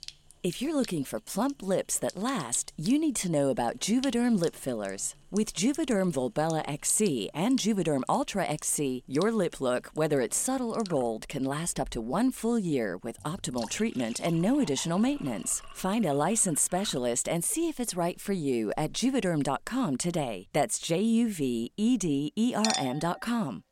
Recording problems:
household noises; noticeable; throughout; 15 dB below the speech

